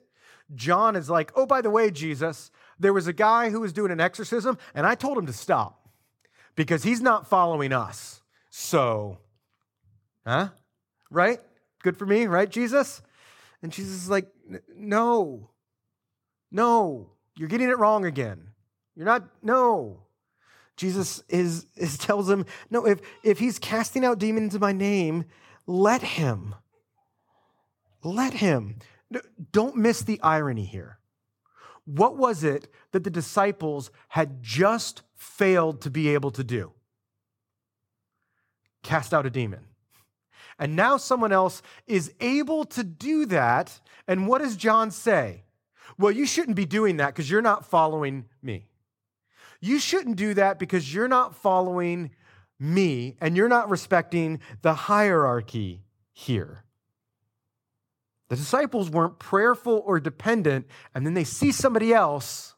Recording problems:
none

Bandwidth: 17 kHz